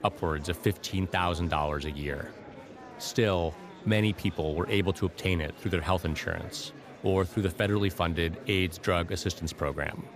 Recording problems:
murmuring crowd; noticeable; throughout; 15 dB below the speech

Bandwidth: 15 kHz